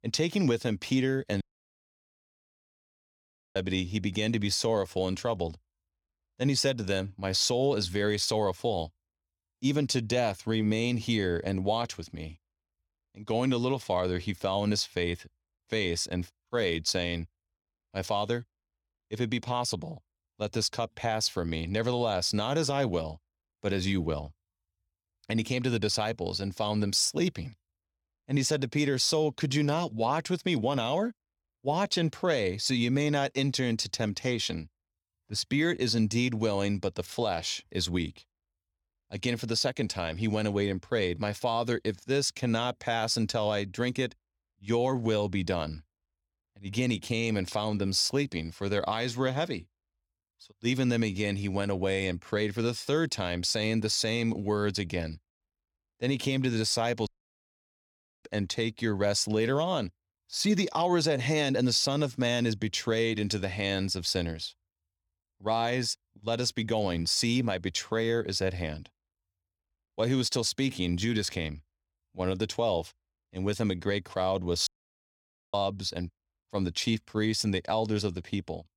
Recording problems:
audio cutting out; at 1.5 s for 2 s, at 57 s for 1 s and at 1:15 for 1 s

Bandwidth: 18.5 kHz